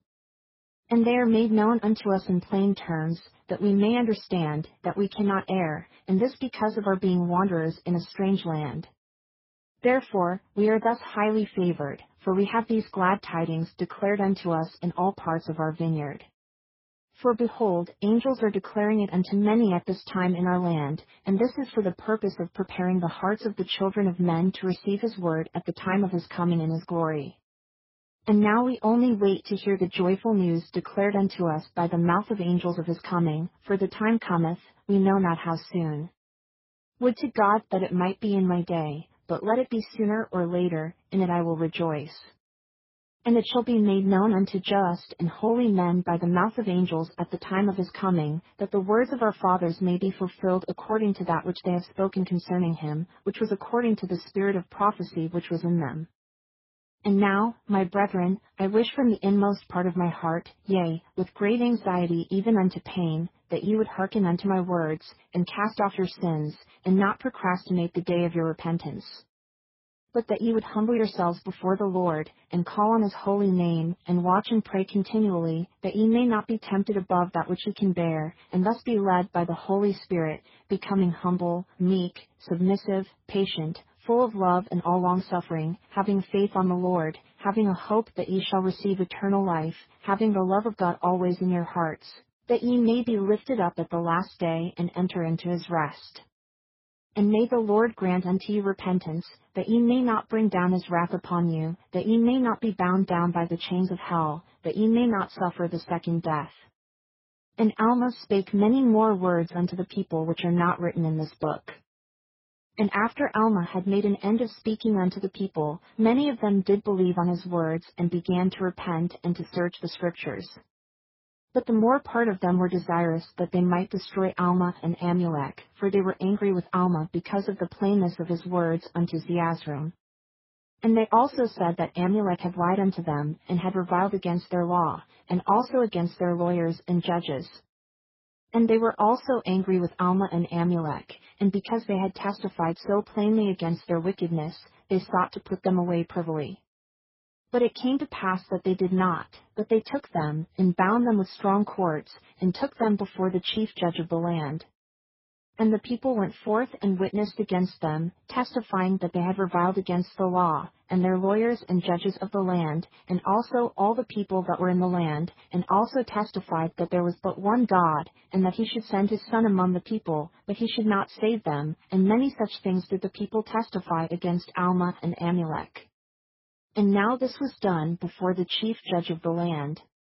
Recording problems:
garbled, watery; badly; nothing above 5.5 kHz

